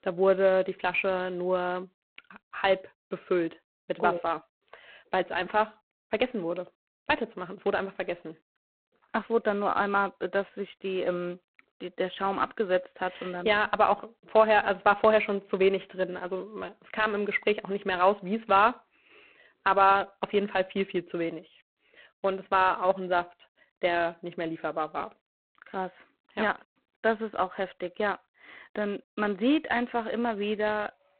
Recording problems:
phone-call audio; poor line; nothing above 4 kHz

